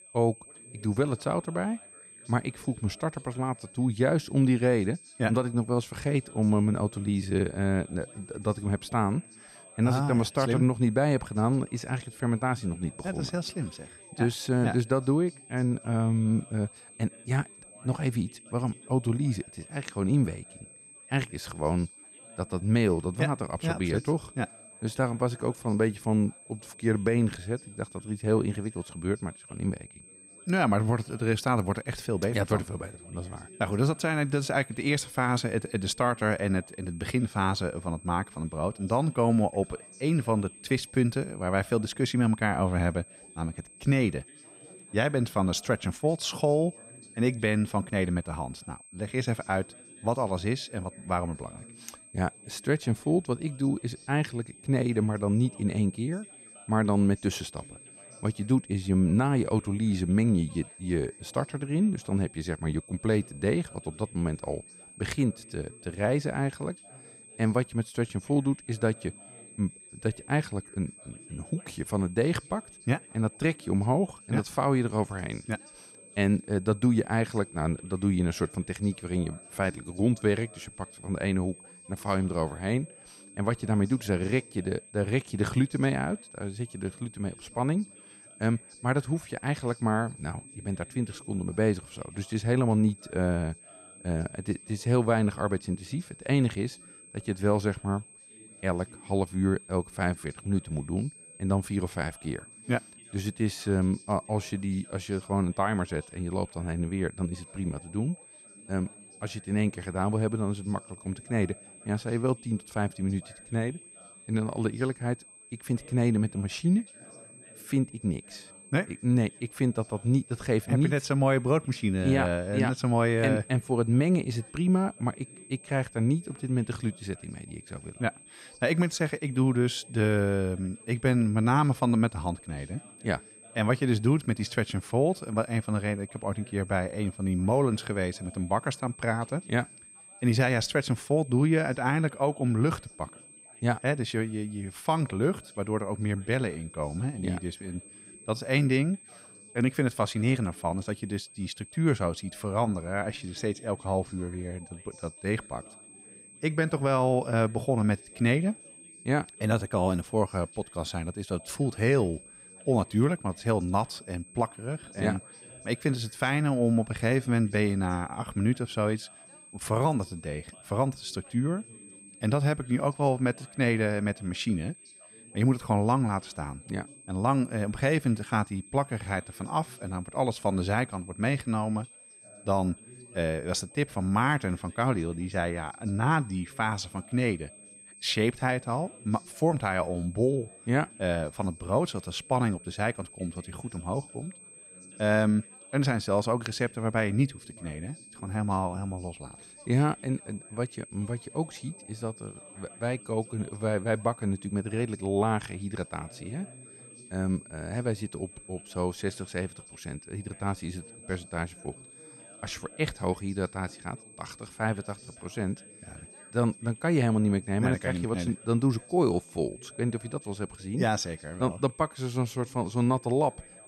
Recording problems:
high-pitched whine; noticeable; throughout; 8.5 kHz, 20 dB below the speech
background chatter; faint; throughout; 4 voices, 25 dB below the speech

